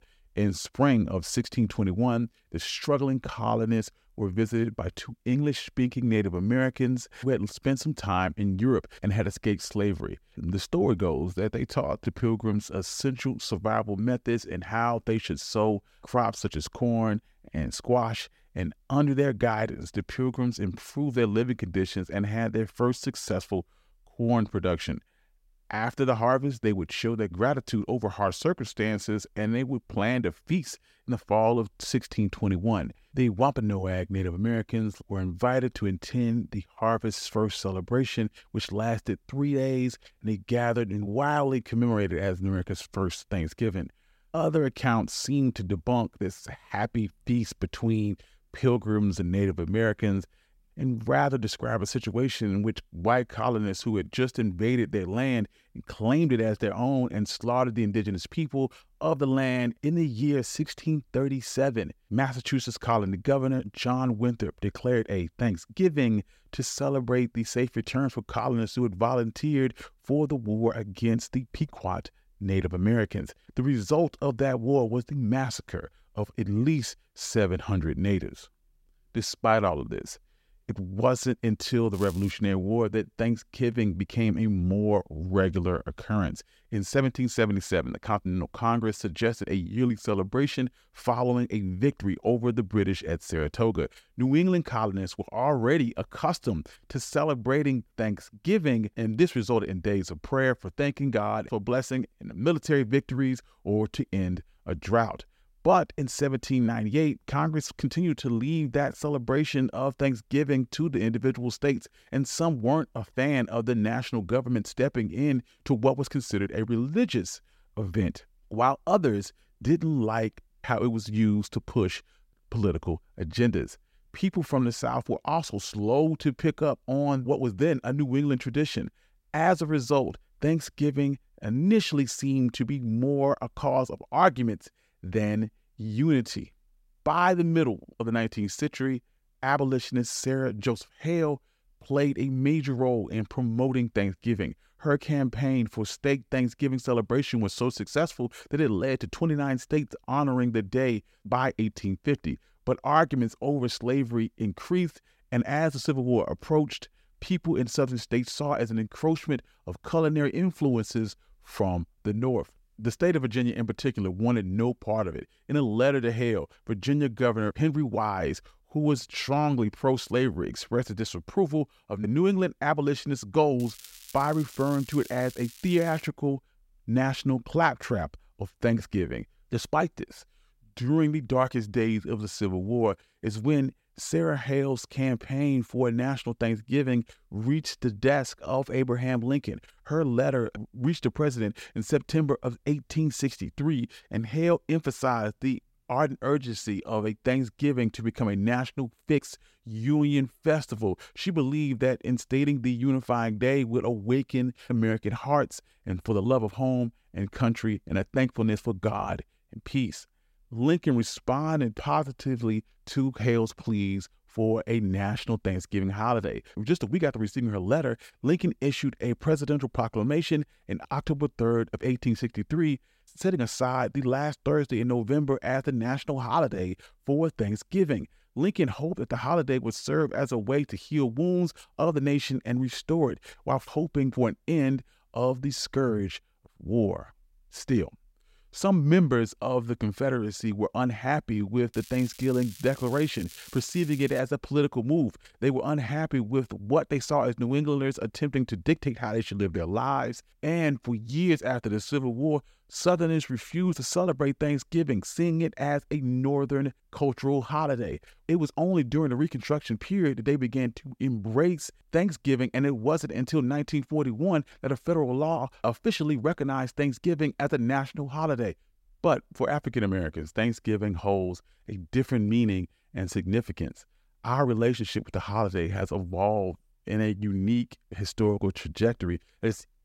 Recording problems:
crackling; noticeable; at 1:22, from 2:54 to 2:56 and from 4:02 to 4:04; 20 dB below the speech

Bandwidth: 16 kHz